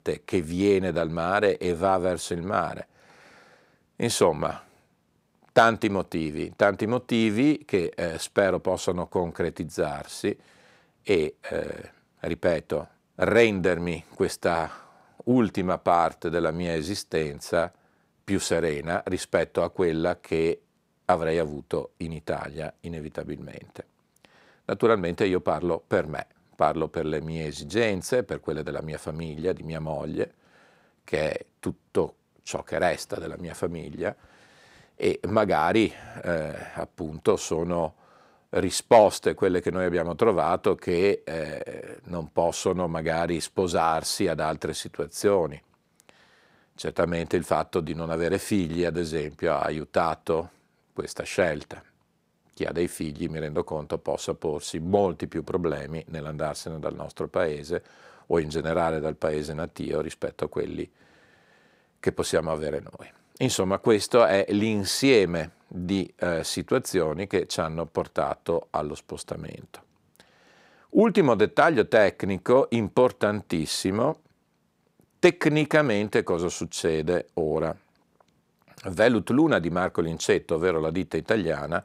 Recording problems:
none

